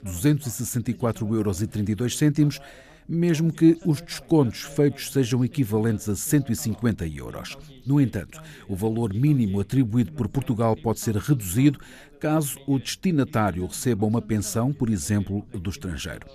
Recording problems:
background chatter; faint; throughout; 2 voices, 25 dB below the speech

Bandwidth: 14.5 kHz